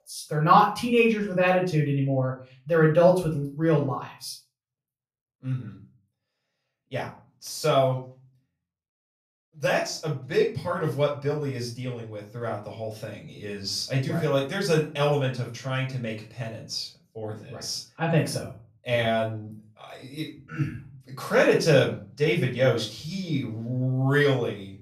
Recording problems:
off-mic speech; far
room echo; slight; dies away in 0.3 s

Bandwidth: 14.5 kHz